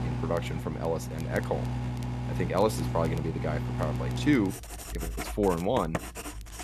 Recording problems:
household noises; loud; throughout; 4 dB below the speech
crackle, like an old record; faint; 25 dB below the speech

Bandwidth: 13.5 kHz